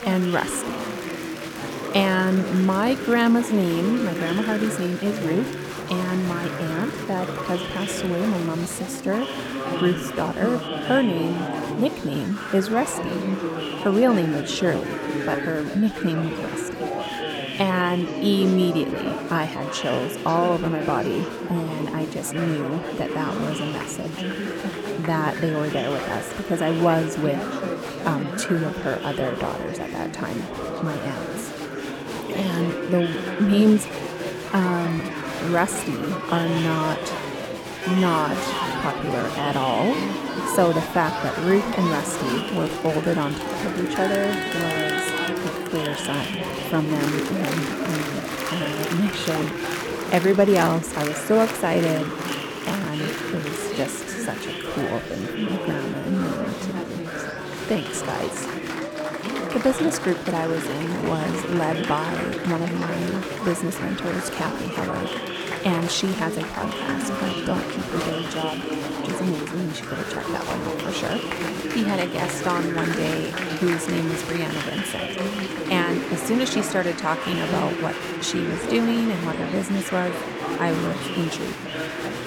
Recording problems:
chatter from many people; loud; throughout; 3 dB below the speech

